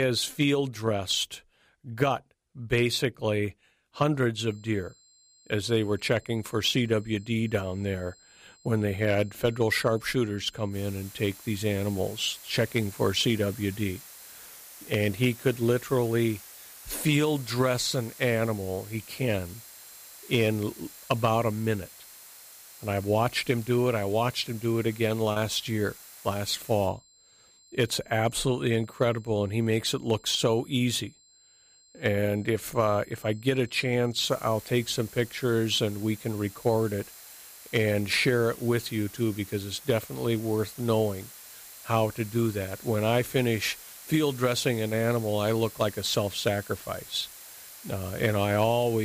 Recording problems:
hiss; noticeable; from 11 to 27 s and from 34 s on; 15 dB below the speech
high-pitched whine; faint; from 4.5 to 14 s, from 17 to 38 s and from 41 s on; 7.5 kHz, 30 dB below the speech
abrupt cut into speech; at the start and the end
choppy; occasionally; at 25 s; 1% of the speech affected

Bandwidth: 15 kHz